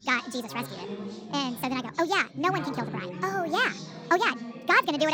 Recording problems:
wrong speed and pitch; too fast and too high; 1.5 times normal speed
background chatter; noticeable; throughout; 3 voices, 10 dB below the speech
abrupt cut into speech; at the end

